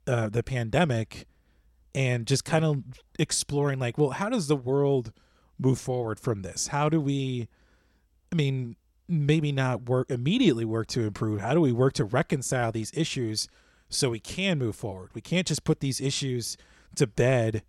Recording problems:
none

